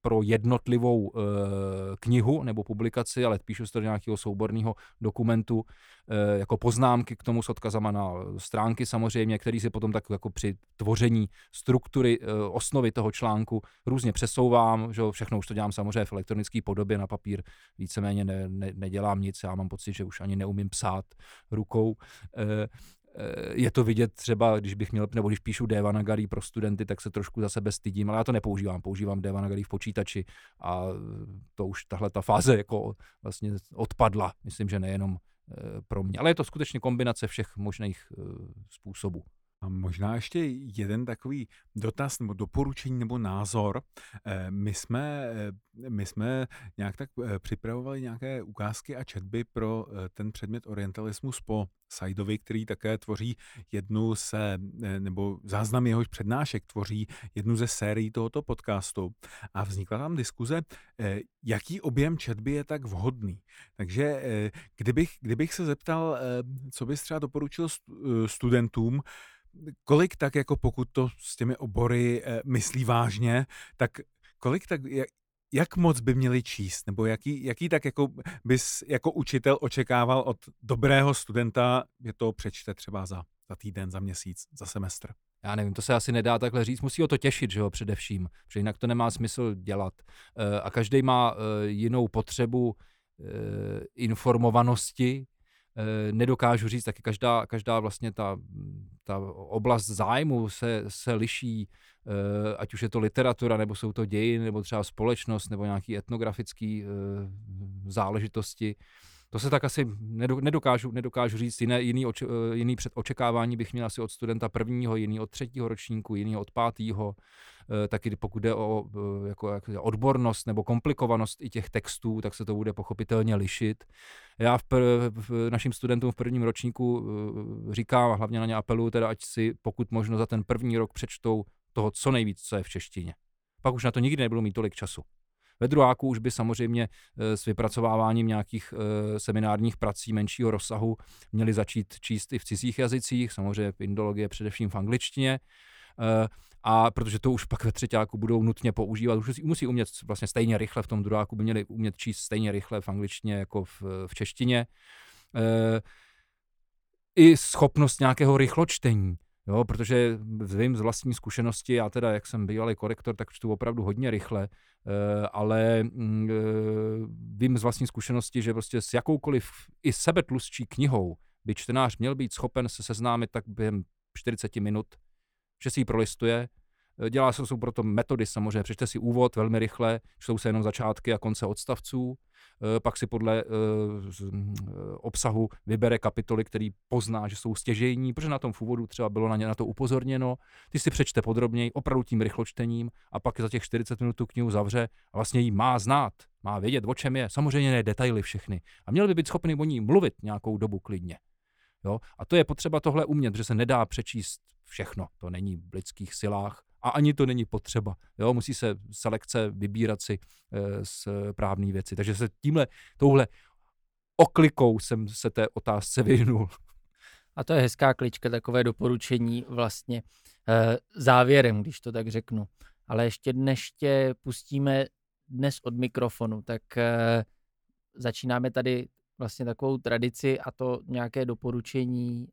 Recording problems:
none

